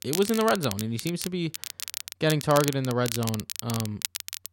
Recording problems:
crackle, like an old record; loud; 7 dB below the speech

